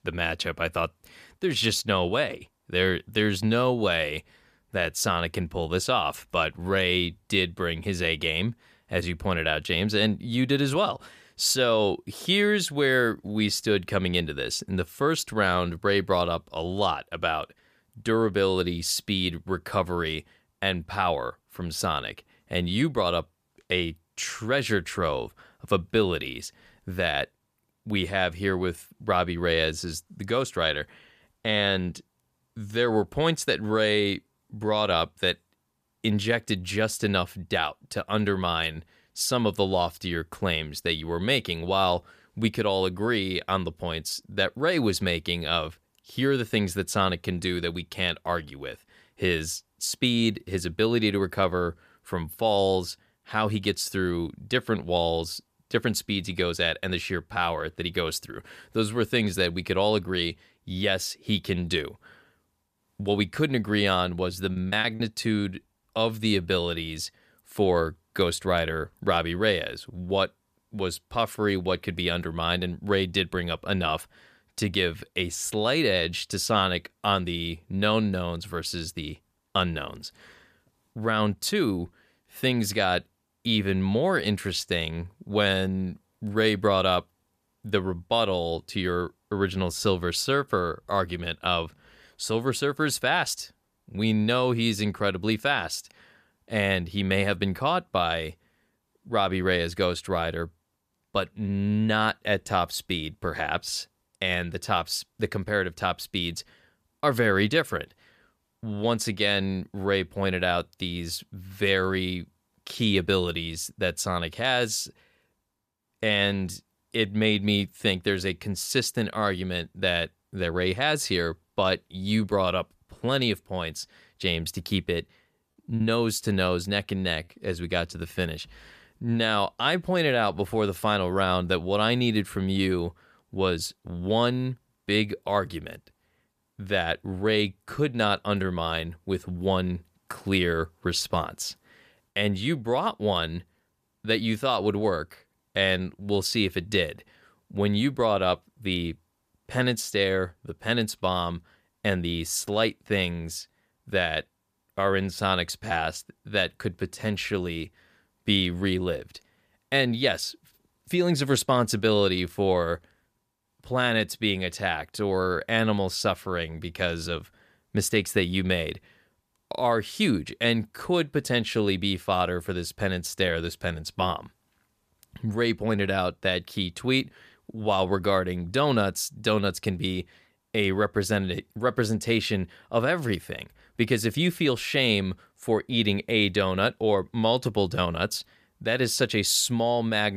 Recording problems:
choppy; very; at 1:05 and at 2:06; 7% of the speech affected
abrupt cut into speech; at the end

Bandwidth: 14.5 kHz